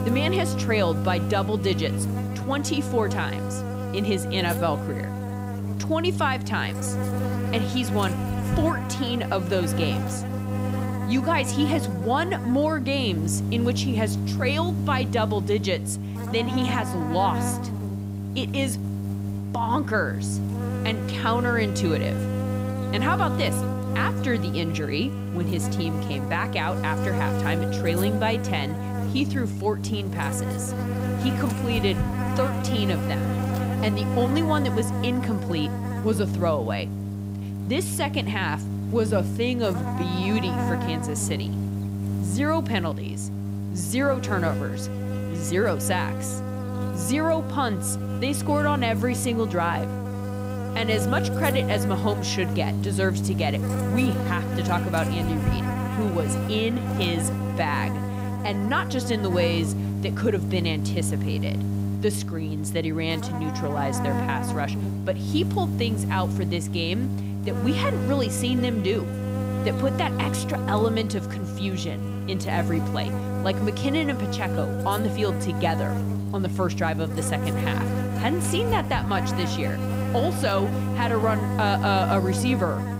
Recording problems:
electrical hum; loud; throughout; 50 Hz, 6 dB below the speech

